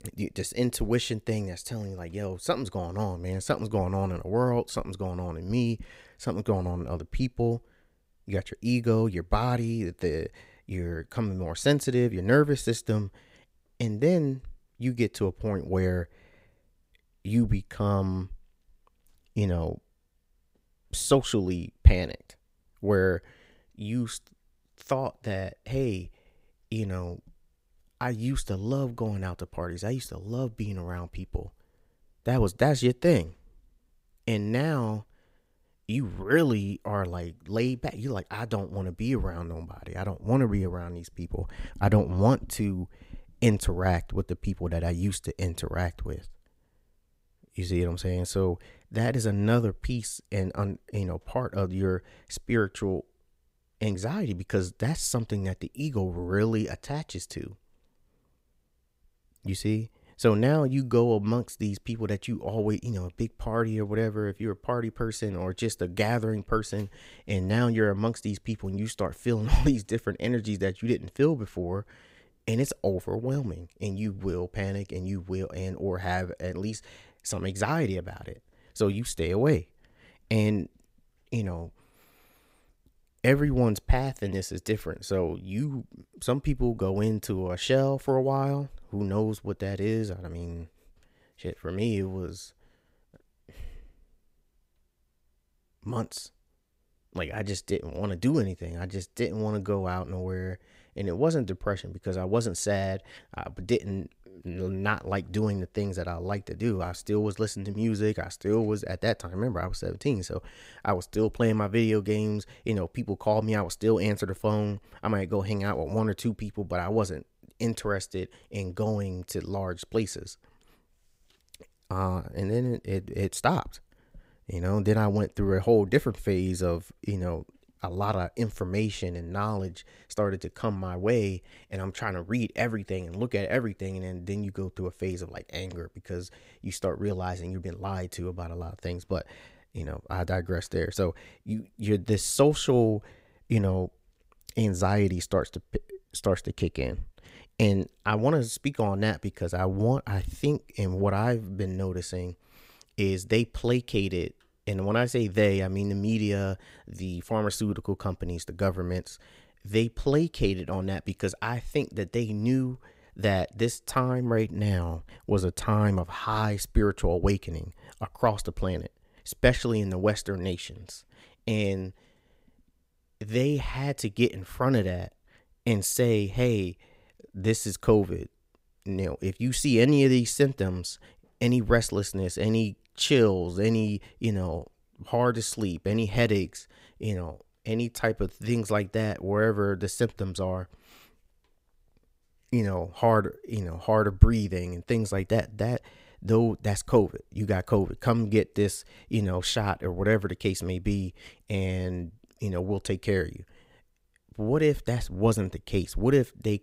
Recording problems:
none

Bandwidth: 15.5 kHz